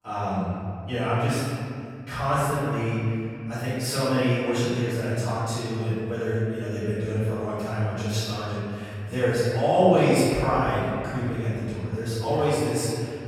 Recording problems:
room echo; strong; dies away in 2.4 s
off-mic speech; far

